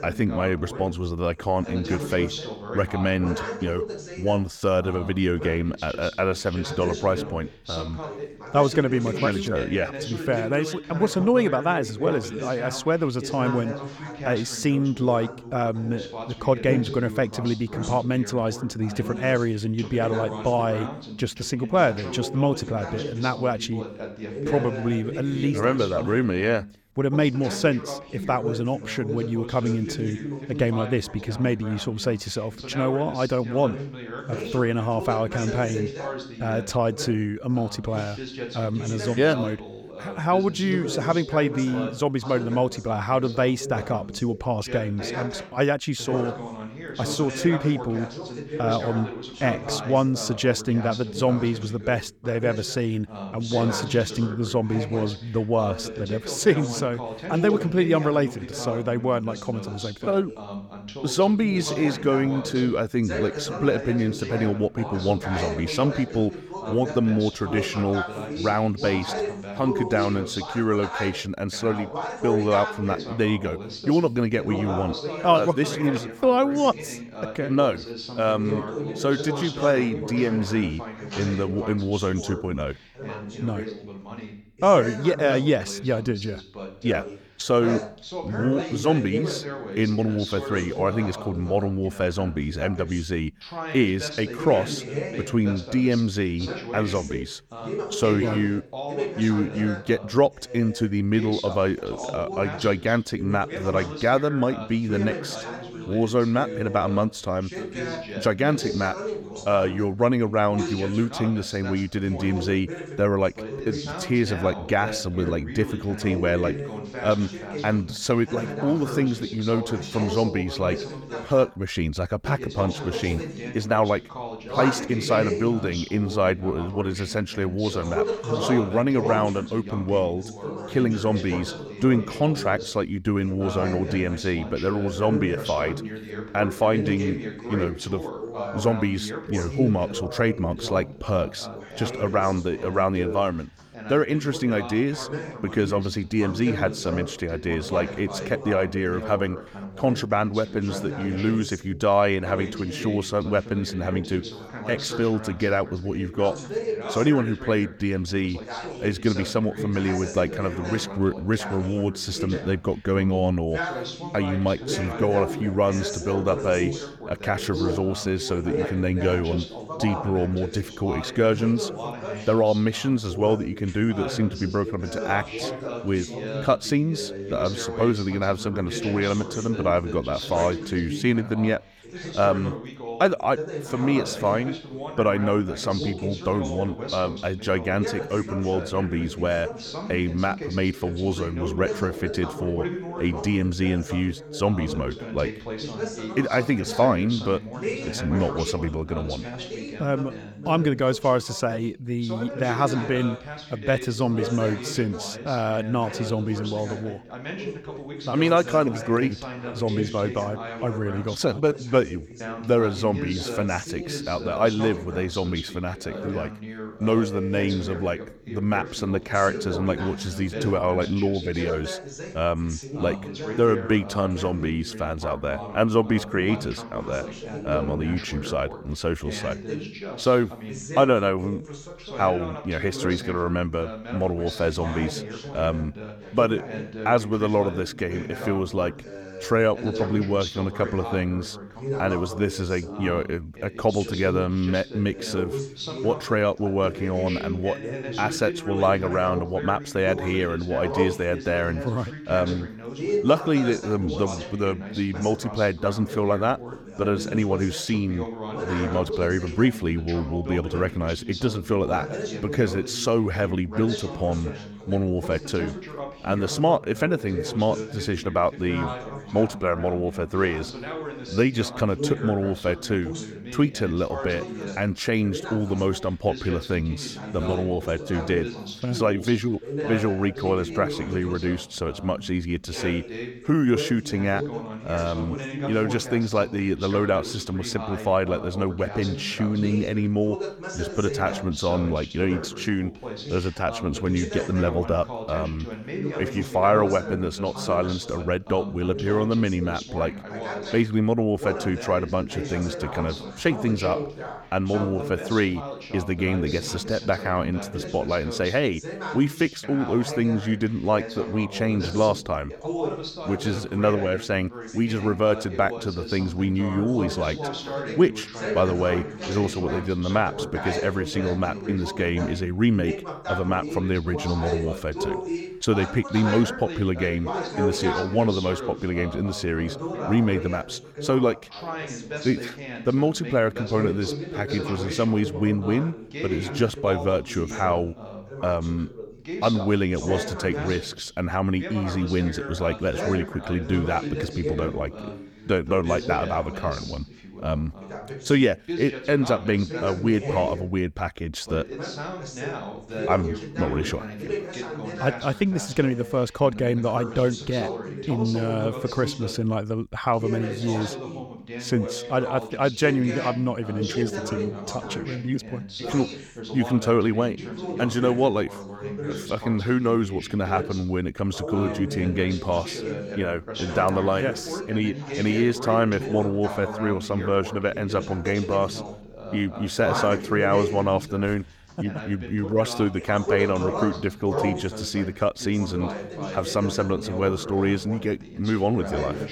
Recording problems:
background chatter; loud; throughout; 2 voices, 8 dB below the speech

